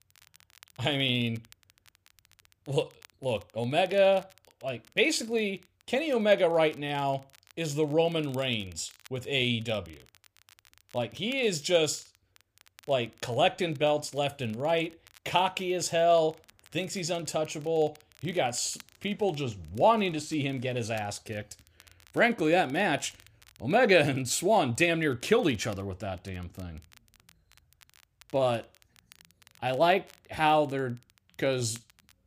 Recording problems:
crackle, like an old record; faint; 30 dB below the speech

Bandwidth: 15 kHz